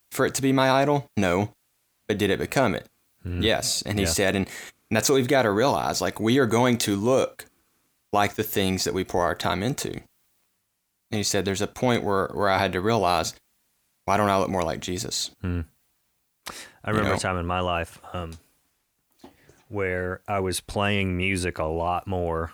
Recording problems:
none

